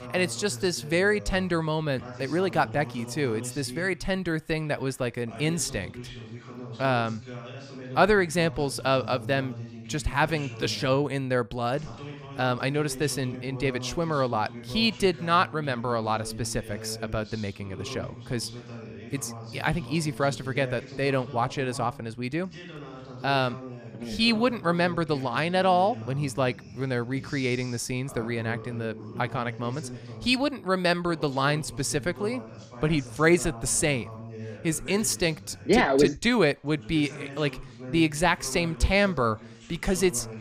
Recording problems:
voice in the background; noticeable; throughout; 15 dB below the speech

